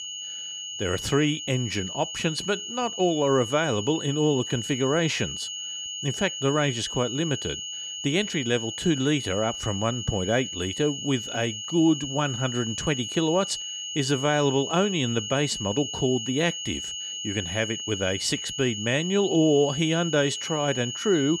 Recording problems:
high-pitched whine; loud; throughout; 3 kHz, 6 dB below the speech

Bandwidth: 15.5 kHz